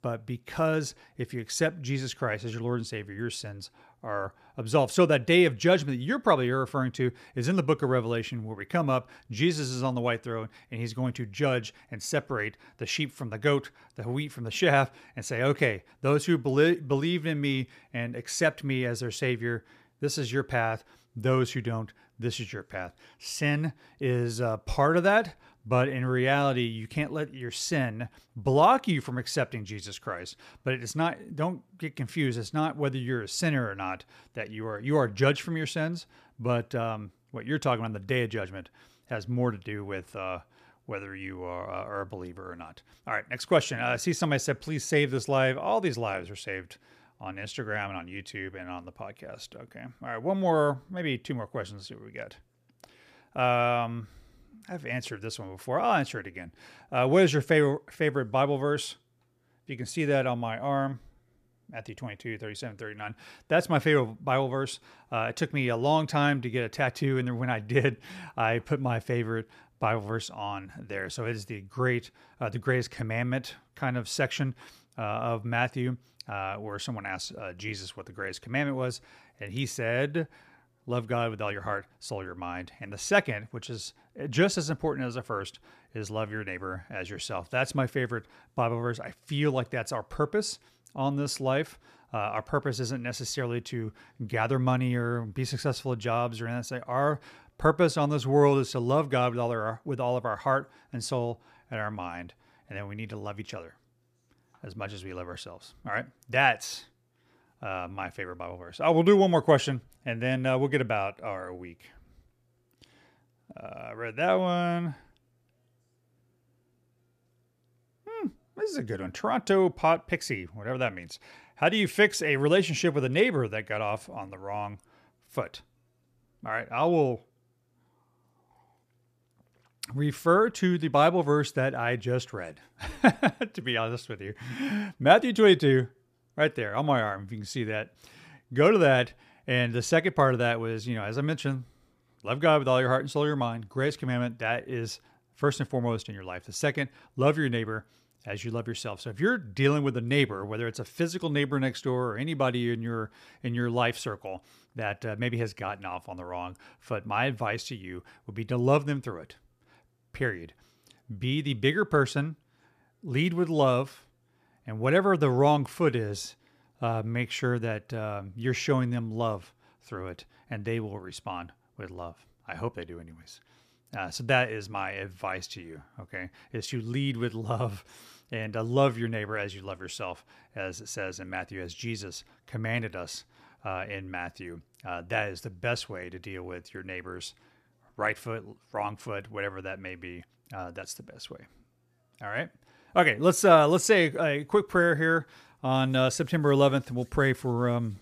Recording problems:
none

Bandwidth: 14.5 kHz